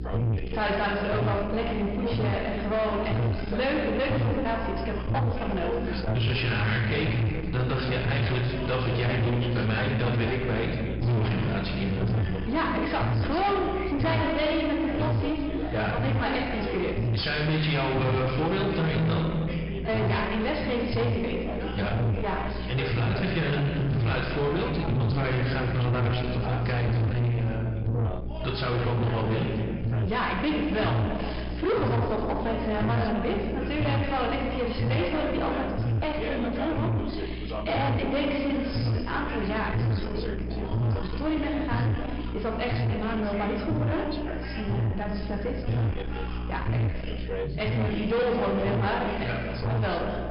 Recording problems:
distortion; heavy; 8 dB below the speech
room echo; noticeable; dies away in 1.3 s
high frequencies cut off; noticeable; nothing above 5.5 kHz
off-mic speech; somewhat distant
electrical hum; loud; throughout; 60 Hz, 9 dB below the speech
background chatter; noticeable; throughout; 2 voices, 10 dB below the speech

